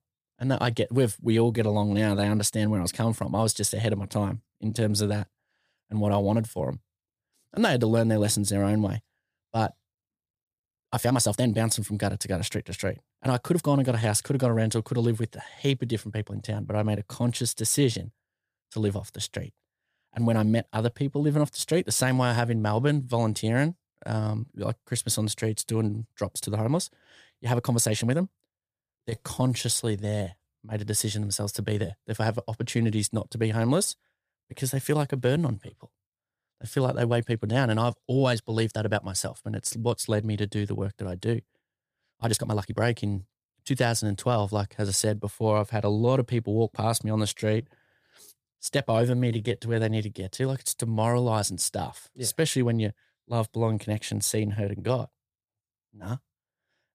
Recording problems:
uneven, jittery; strongly; from 1.5 to 50 s

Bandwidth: 15 kHz